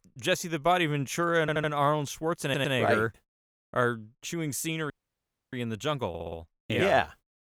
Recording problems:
audio stuttering; at 1.5 s, at 2.5 s and at 6 s
audio cutting out; at 5 s for 0.5 s

